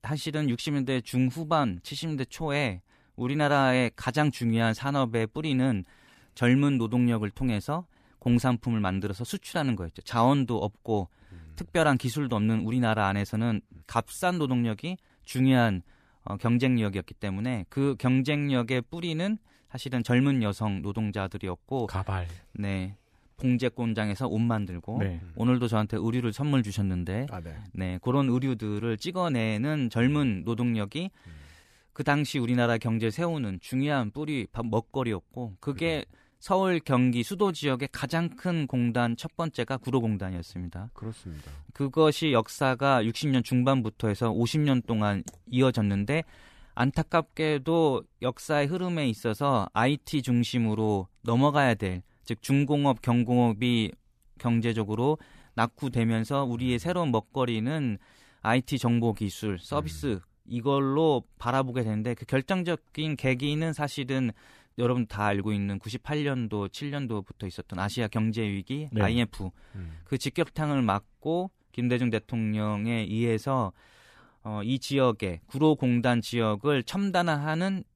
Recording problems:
none

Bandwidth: 14.5 kHz